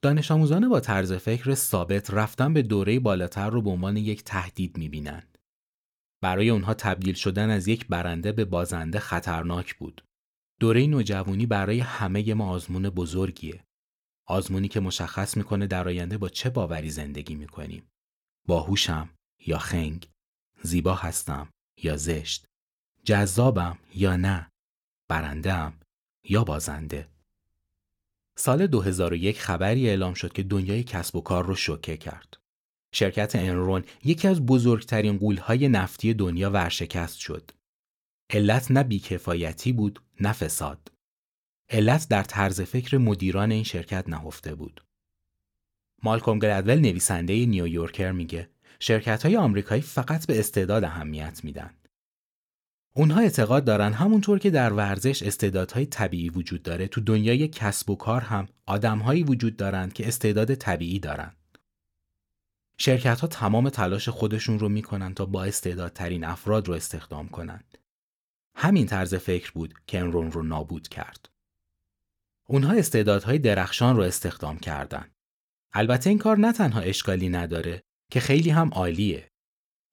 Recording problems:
none

